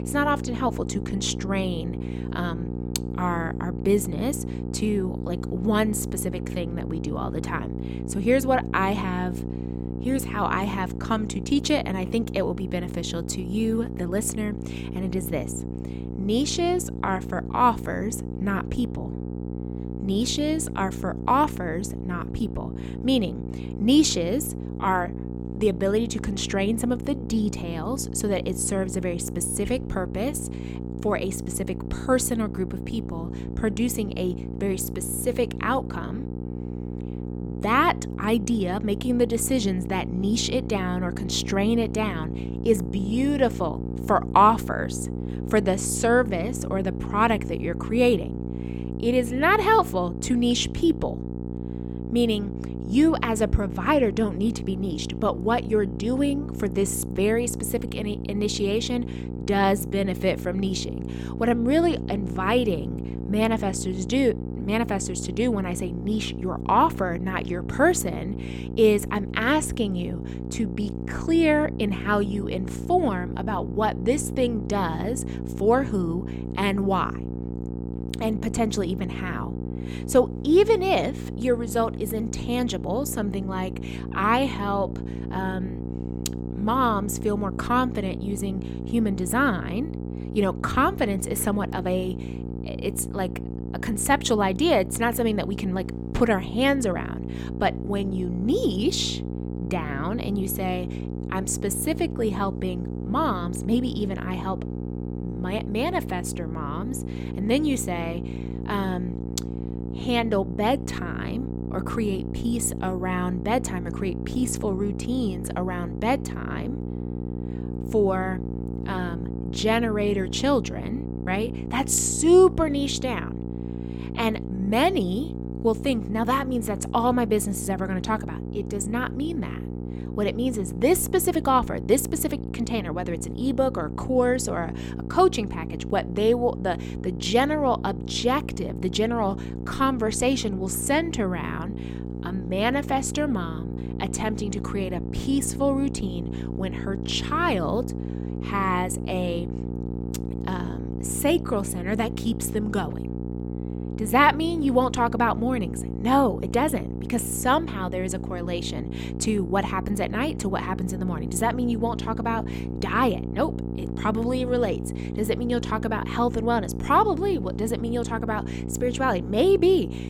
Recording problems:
electrical hum; noticeable; throughout; 60 Hz, 15 dB below the speech

